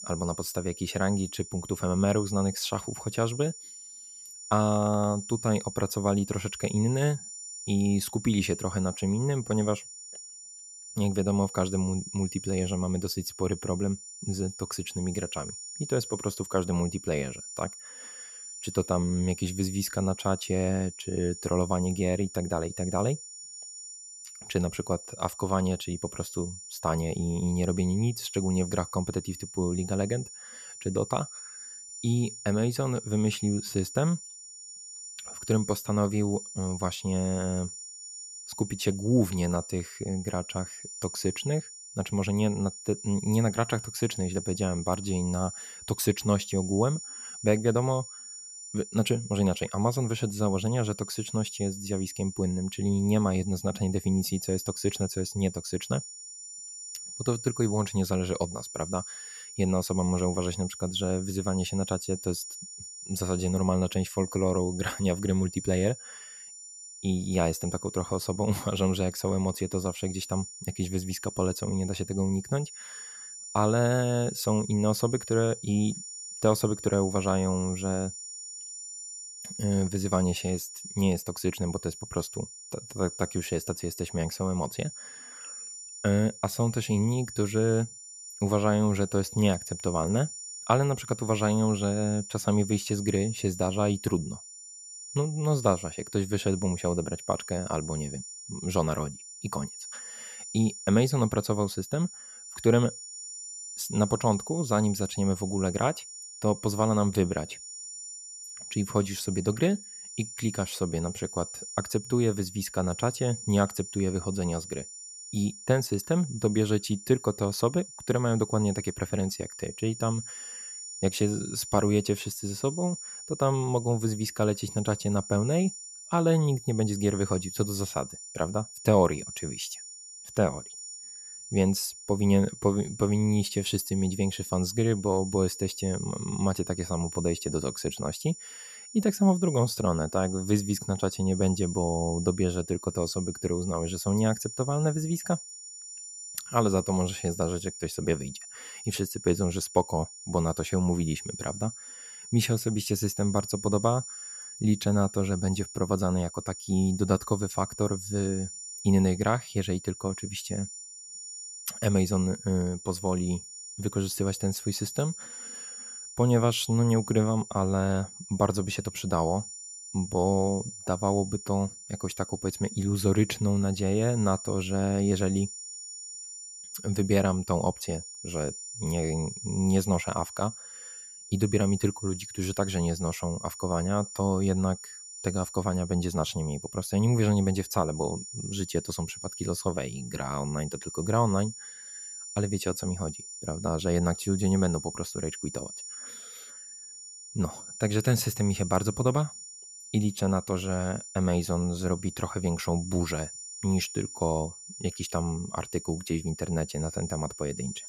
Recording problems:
high-pitched whine; noticeable; throughout; 7 kHz, 10 dB below the speech

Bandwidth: 14.5 kHz